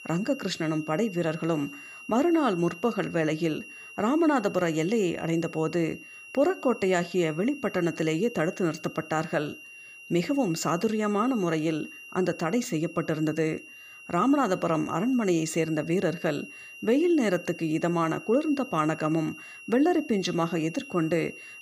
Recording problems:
high-pitched whine; noticeable; throughout; 3 kHz, 15 dB below the speech

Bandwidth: 15 kHz